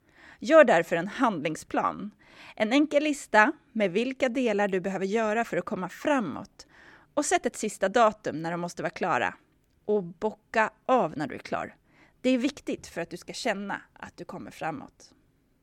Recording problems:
none

